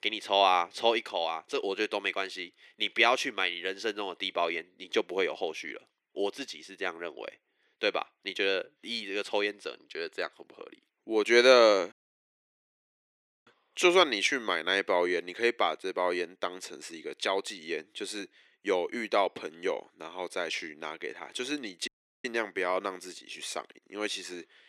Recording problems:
thin; very; fading below 350 Hz
audio cutting out; at 12 s for 1.5 s and at 22 s

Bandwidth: 14 kHz